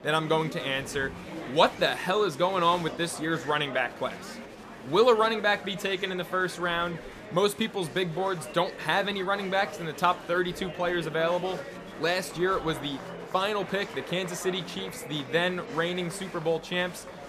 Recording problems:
murmuring crowd; noticeable; throughout; 15 dB below the speech

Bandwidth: 14.5 kHz